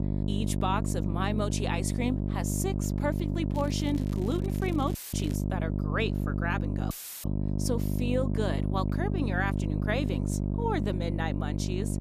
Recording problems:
electrical hum; loud; throughout; 50 Hz, 5 dB below the speech
crackling; noticeable; from 3.5 to 5.5 s; 20 dB below the speech
audio cutting out; filled with static; at 5 s and at 7 s

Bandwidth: 14.5 kHz